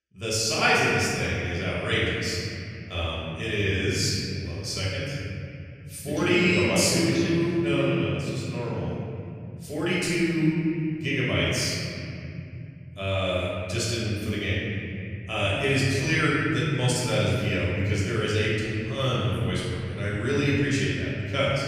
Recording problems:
room echo; strong; dies away in 3 s
off-mic speech; far

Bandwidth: 14.5 kHz